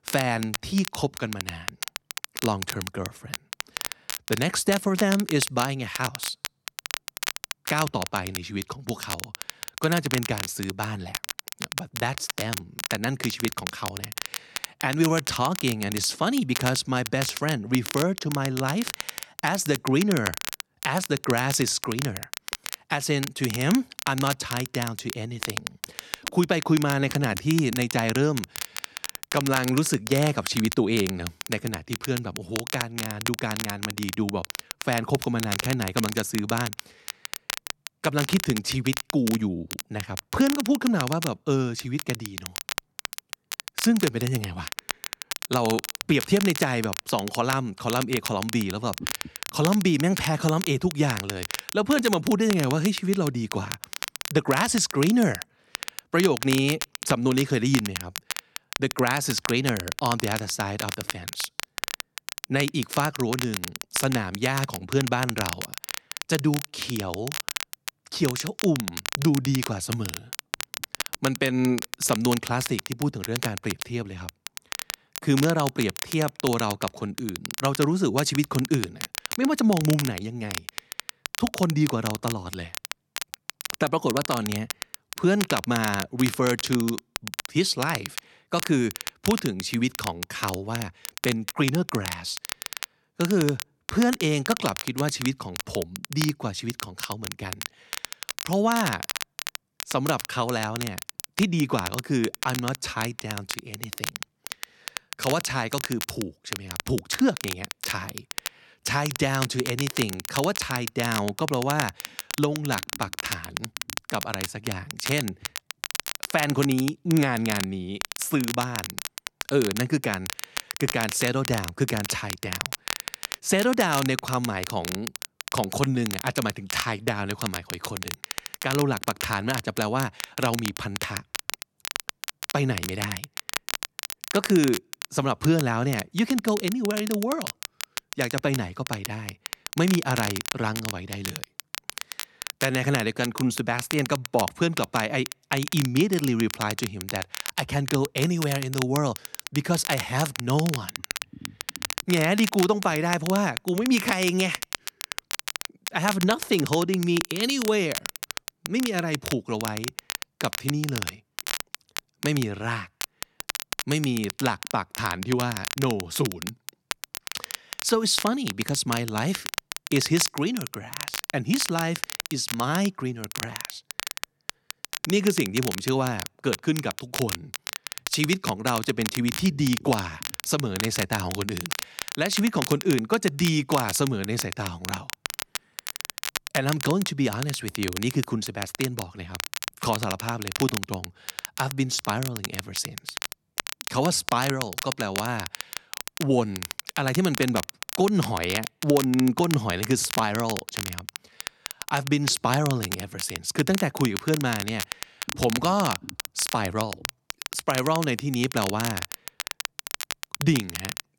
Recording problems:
crackle, like an old record; loud; 7 dB below the speech

